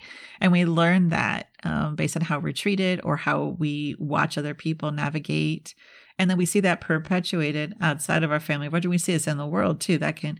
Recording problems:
uneven, jittery; strongly; from 1.5 to 8 s

